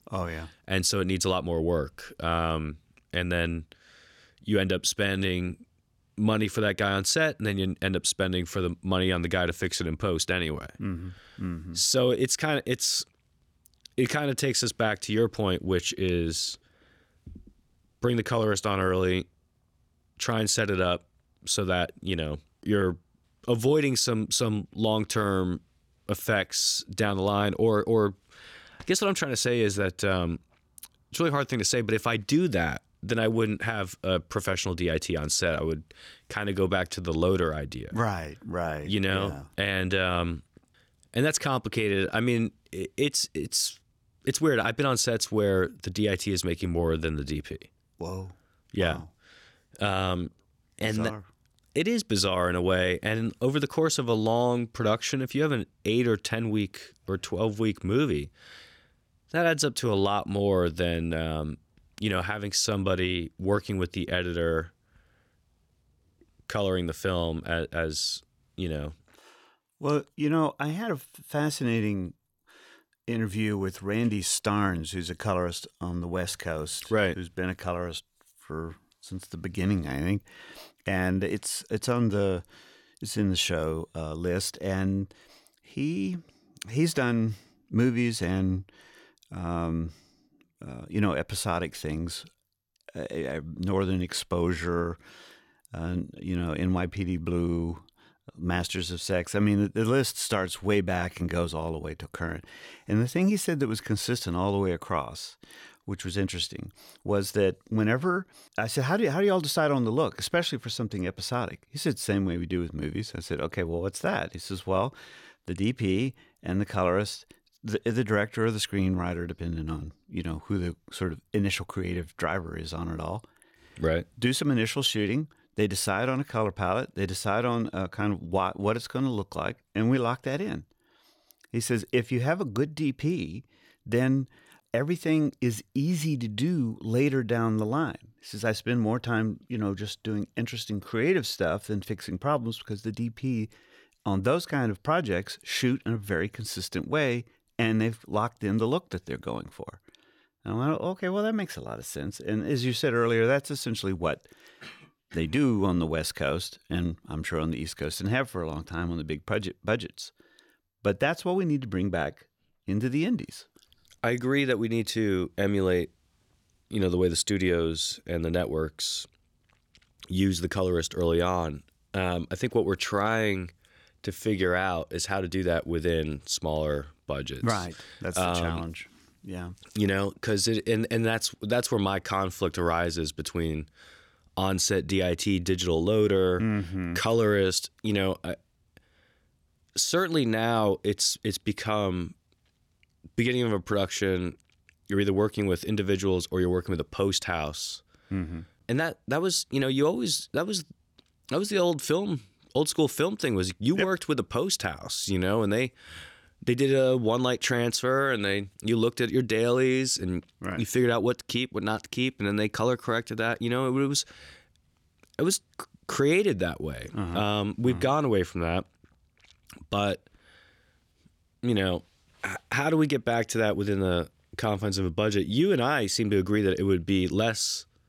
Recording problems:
none

